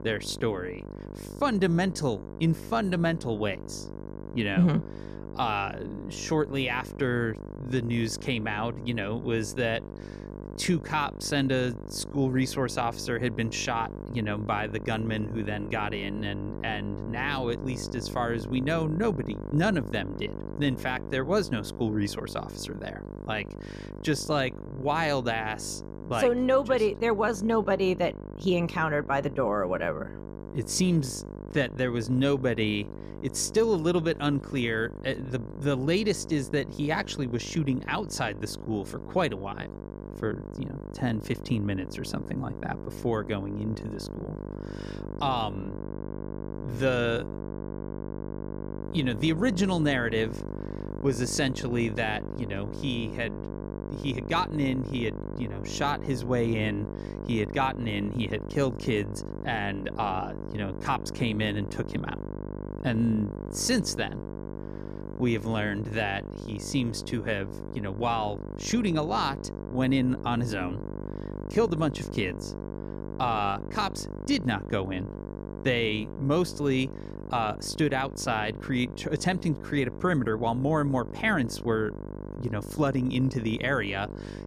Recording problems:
electrical hum; noticeable; throughout; 50 Hz, 15 dB below the speech

